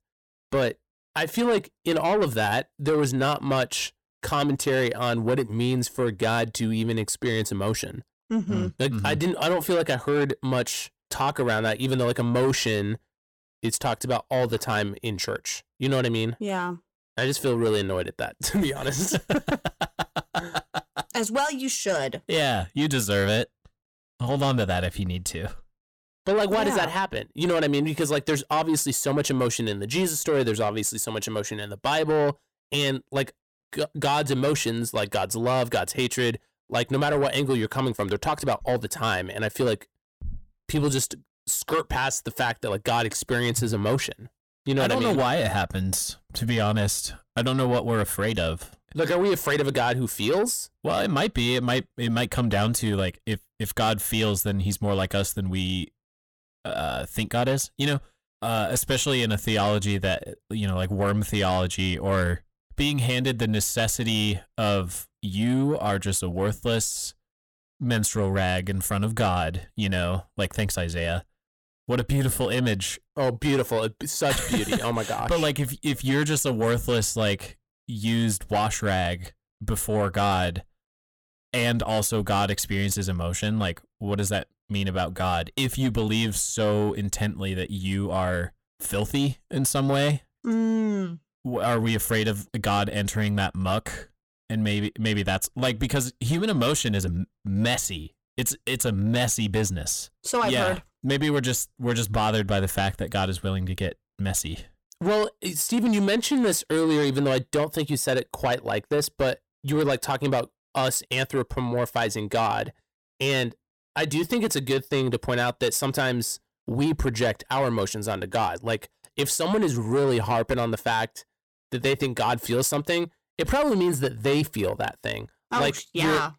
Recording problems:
distortion; slight; 10 dB below the speech

